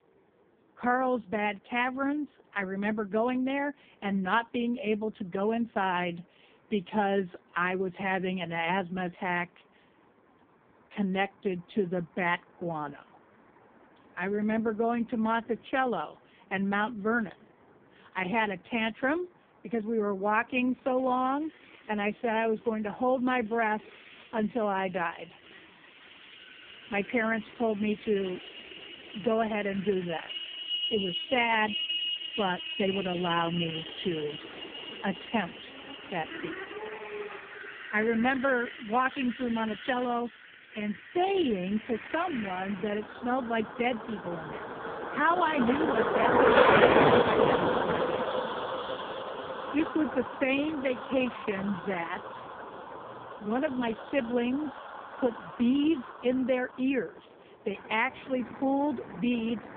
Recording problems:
phone-call audio; poor line
traffic noise; loud; throughout; 2 dB below the speech

